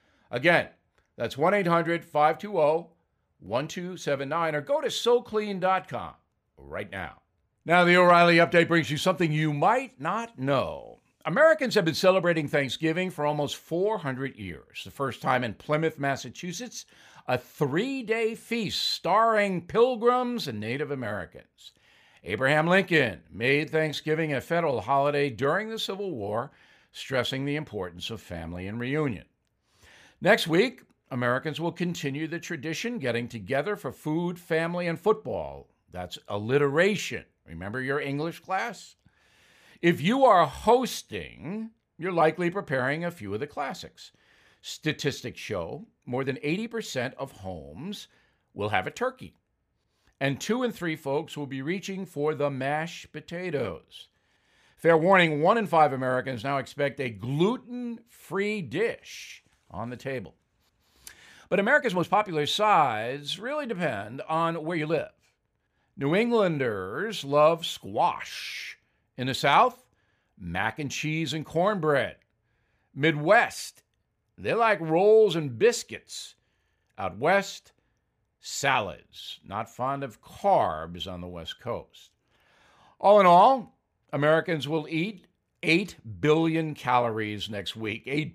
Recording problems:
uneven, jittery; strongly; from 7.5 s to 1:25

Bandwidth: 15 kHz